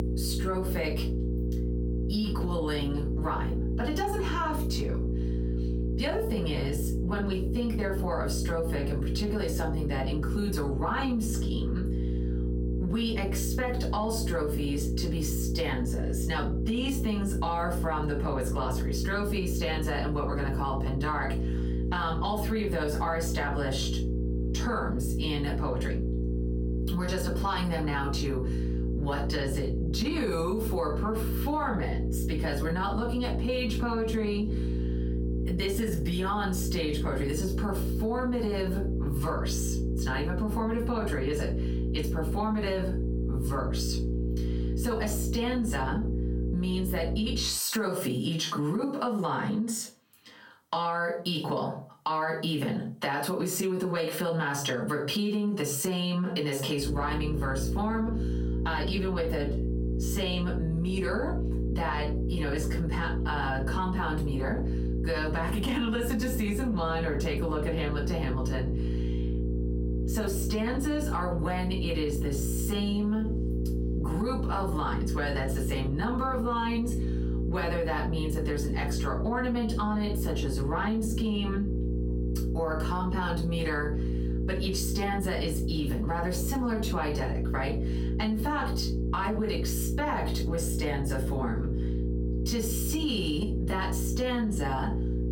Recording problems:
off-mic speech; far
room echo; slight; dies away in 0.3 s
squashed, flat; somewhat
electrical hum; loud; until 47 s and from 57 s on; 60 Hz, 9 dB below the speech

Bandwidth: 17 kHz